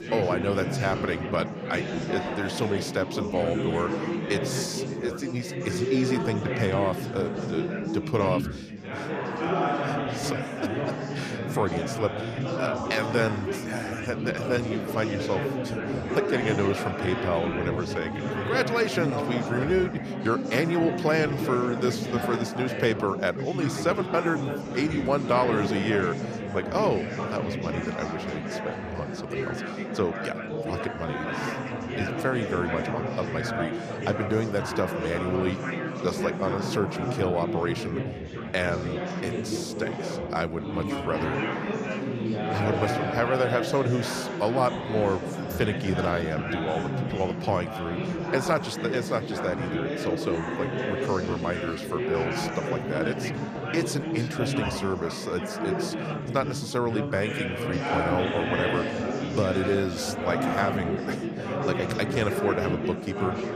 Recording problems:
chatter from many people; loud; throughout; 1 dB below the speech

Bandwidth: 14.5 kHz